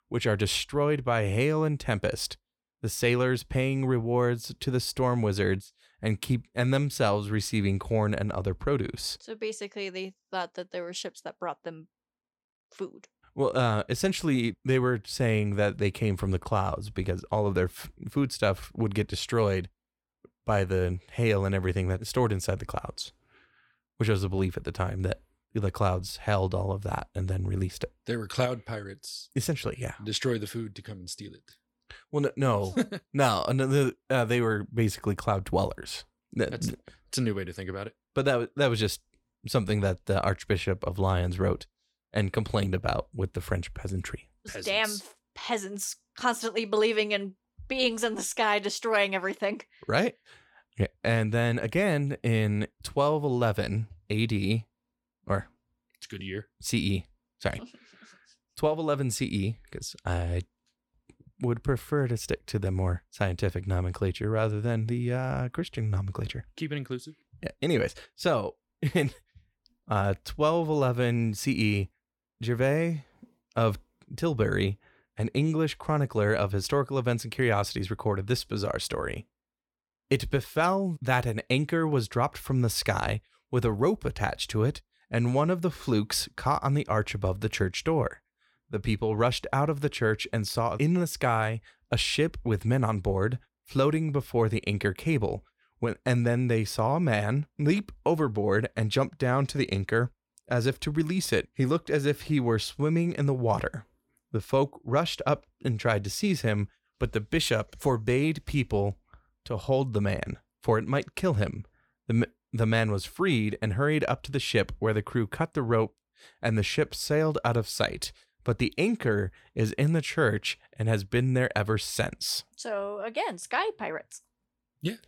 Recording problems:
none

